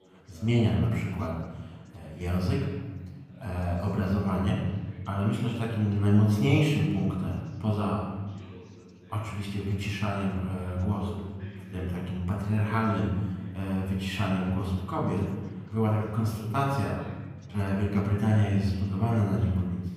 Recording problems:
off-mic speech; far
room echo; noticeable; dies away in 1.3 s
background chatter; faint; throughout; 3 voices, 25 dB below the speech

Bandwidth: 15 kHz